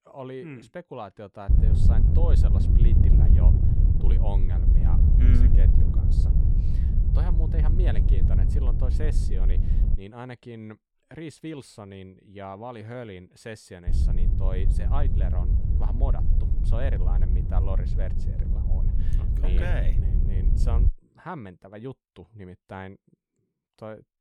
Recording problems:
wind noise on the microphone; heavy; from 1.5 to 10 s and from 14 to 21 s; as loud as the speech

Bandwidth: 18 kHz